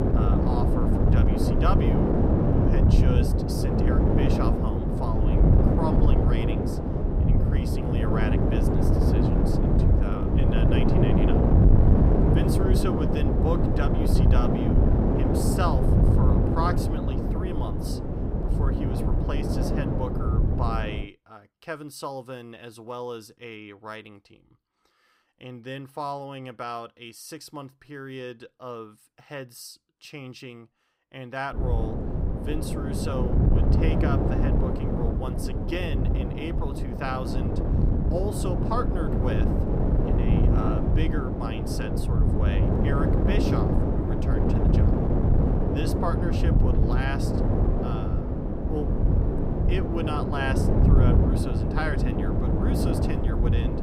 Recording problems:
wind noise on the microphone; heavy; until 21 s and from 32 s on; 3 dB above the speech

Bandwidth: 15.5 kHz